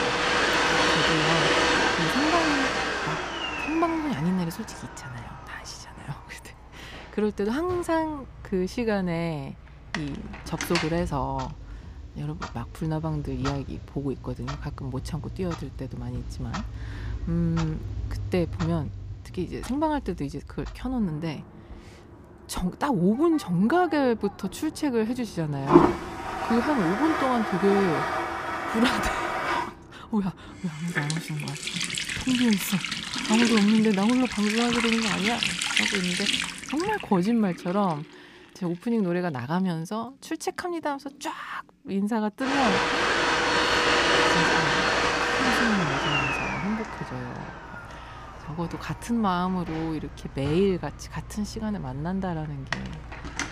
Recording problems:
household noises; very loud; throughout; 2 dB above the speech

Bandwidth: 15 kHz